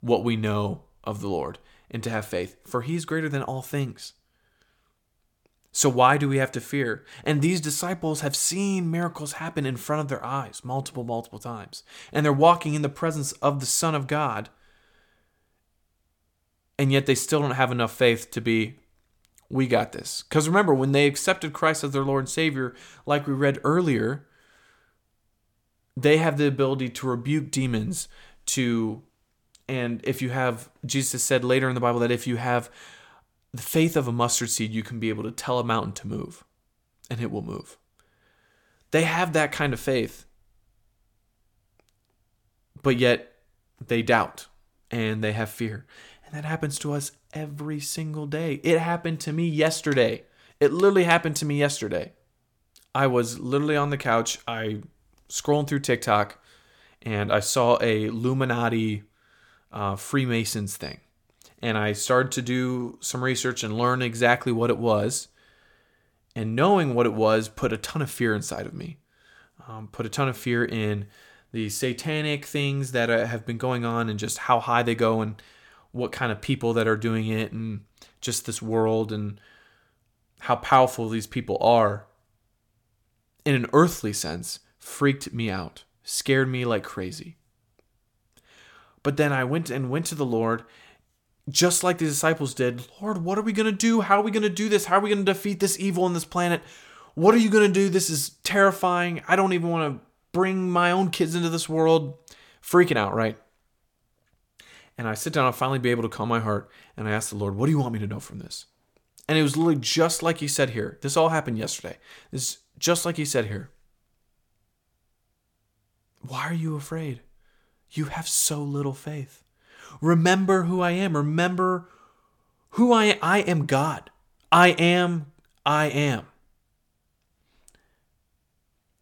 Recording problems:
none

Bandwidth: 17.5 kHz